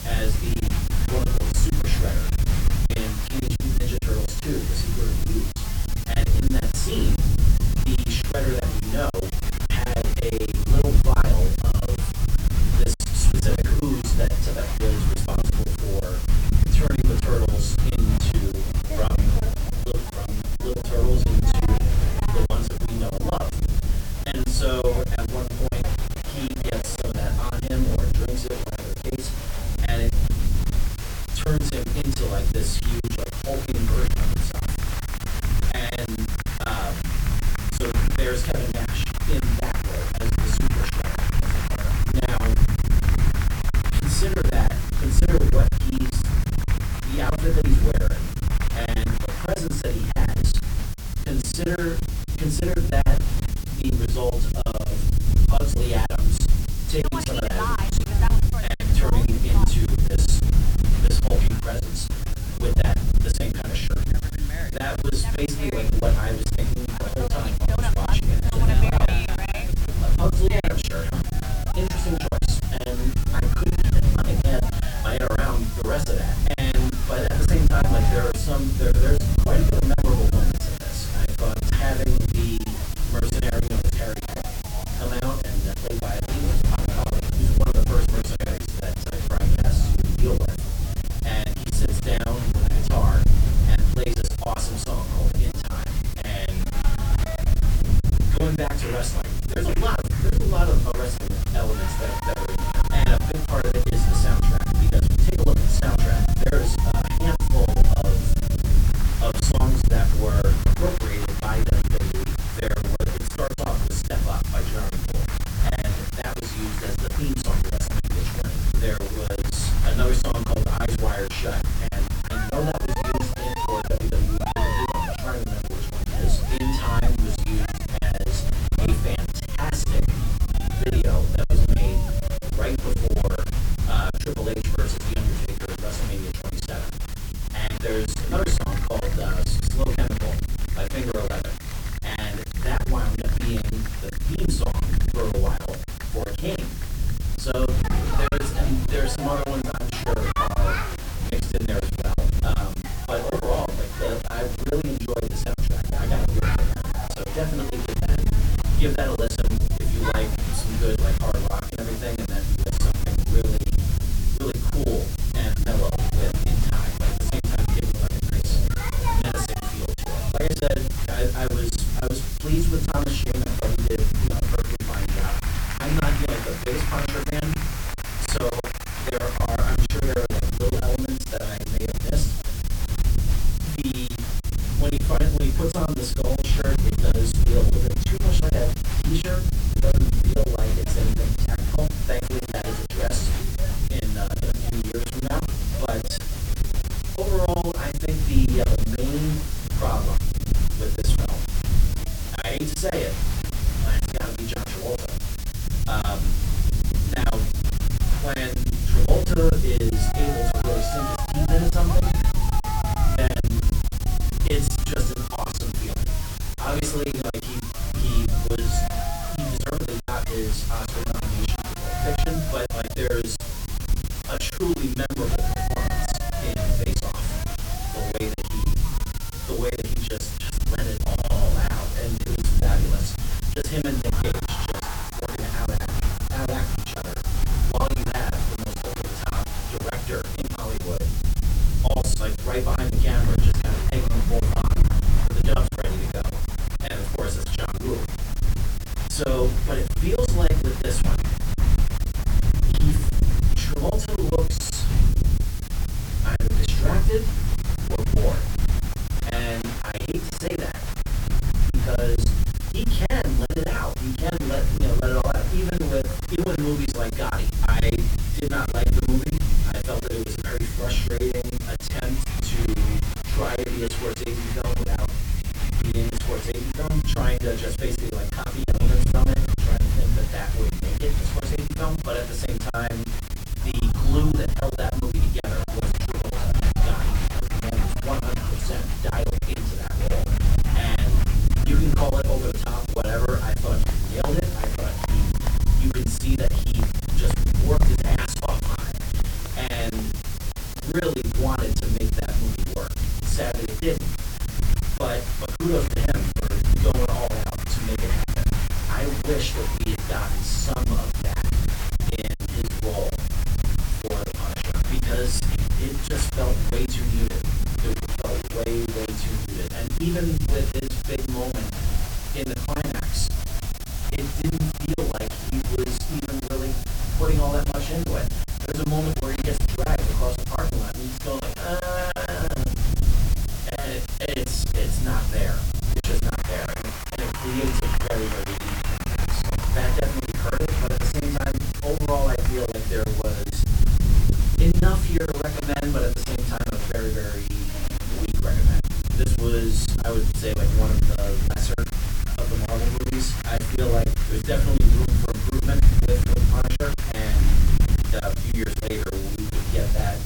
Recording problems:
off-mic speech; far
room echo; very slight; dies away in 0.3 s
crowd noise; loud; throughout; 8 dB below the speech
hiss; loud; throughout; 8 dB below the speech
low rumble; loud; throughout; 9 dB below the speech
choppy; very; 13% of the speech affected

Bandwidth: 18.5 kHz